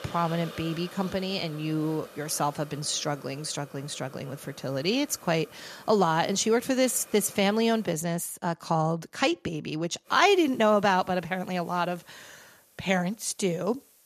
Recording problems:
hiss; faint; until 8 s and from 10 s on; 20 dB below the speech

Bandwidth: 14.5 kHz